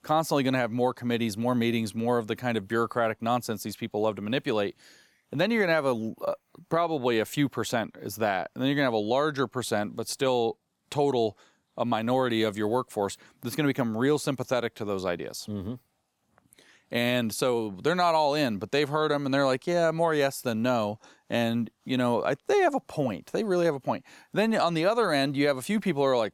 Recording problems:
none

